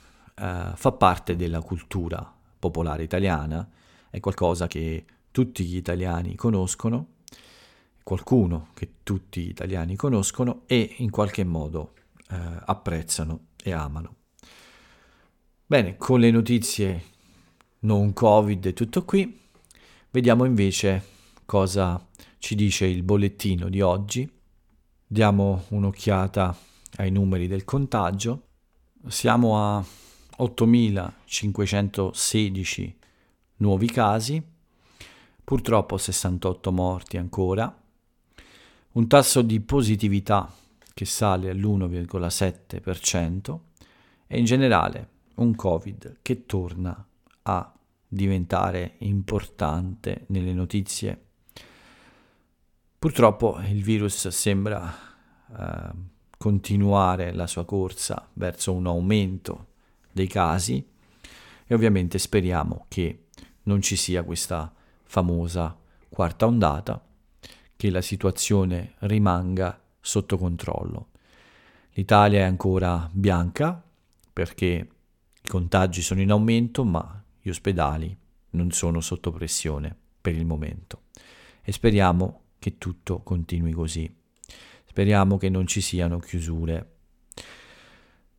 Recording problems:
uneven, jittery; strongly; from 4 to 57 s

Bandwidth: 17.5 kHz